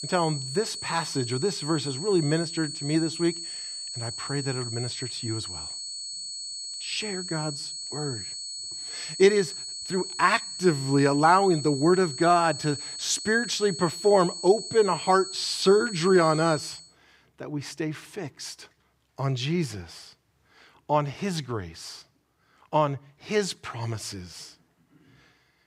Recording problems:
high-pitched whine; loud; until 17 s; 4.5 kHz, 8 dB below the speech

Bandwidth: 15.5 kHz